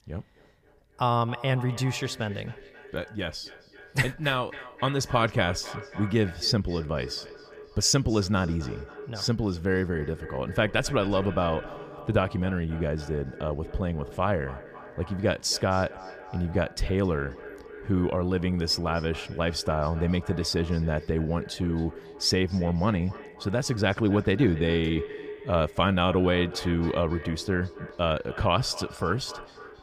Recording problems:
echo of what is said; noticeable; throughout; 270 ms later, 15 dB below the speech
background music; faint; from 6.5 s on; 30 dB below the speech

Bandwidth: 15 kHz